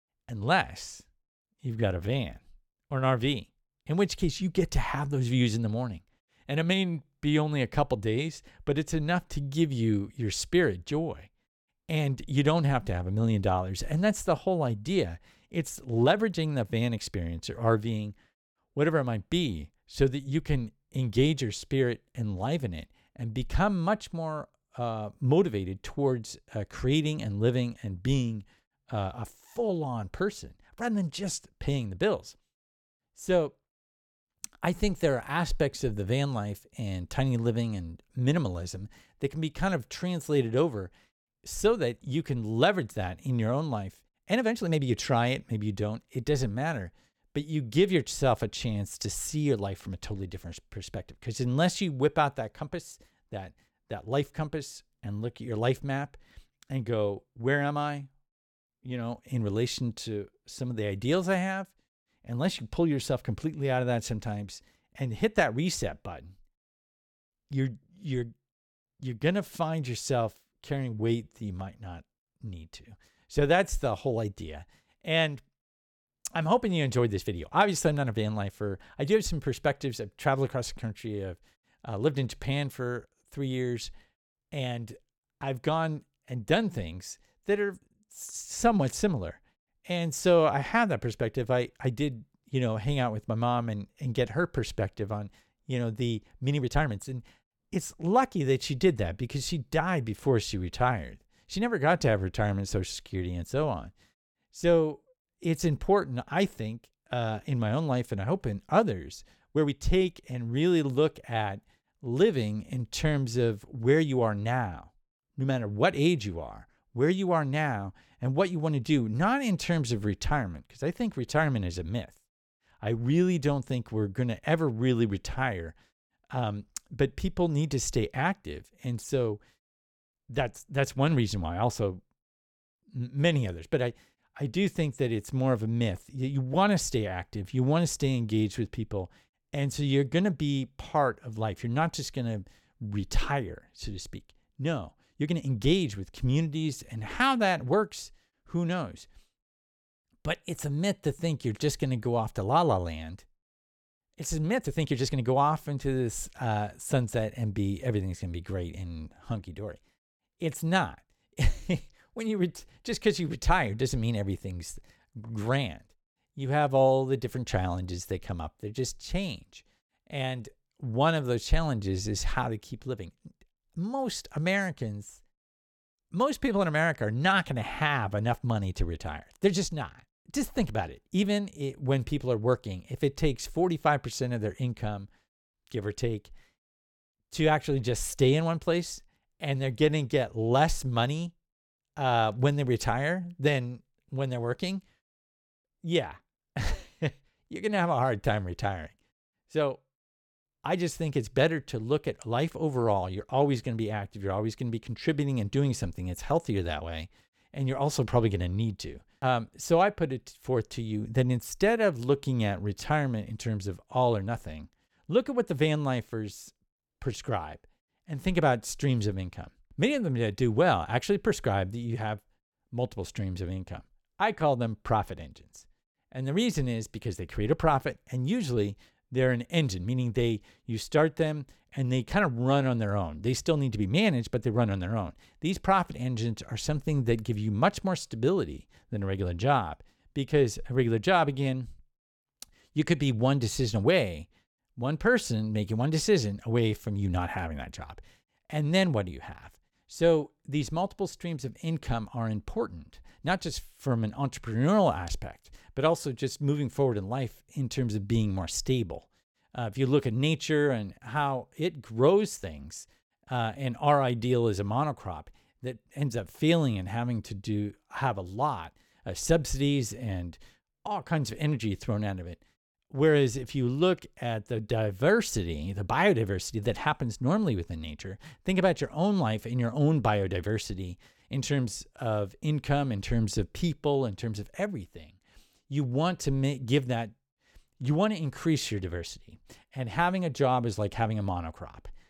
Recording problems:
uneven, jittery; strongly; from 1.5 s to 4:42

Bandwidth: 17 kHz